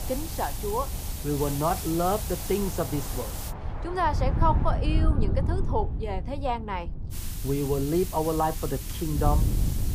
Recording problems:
muffled; slightly; fading above 2 kHz
hiss; loud; until 3.5 s and from 7 s on; 8 dB below the speech
train or aircraft noise; noticeable; until 7 s; 15 dB below the speech
wind noise on the microphone; occasional gusts; 15 dB below the speech

